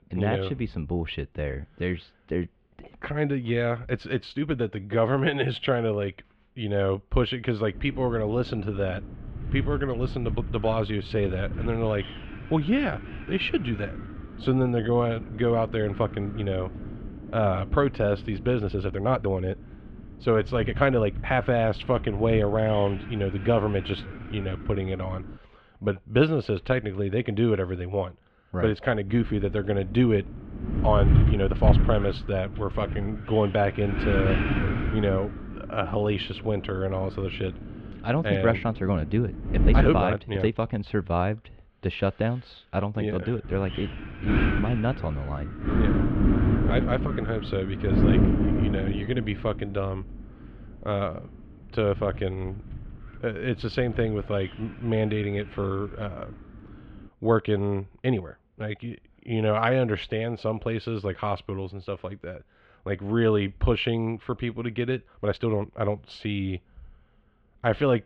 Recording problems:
muffled; slightly; fading above 3 kHz
wind noise on the microphone; heavy; from 8 to 25 s, from 29 to 40 s and from 43 to 57 s; 8 dB below the speech
uneven, jittery; strongly; from 1.5 s to 1:06

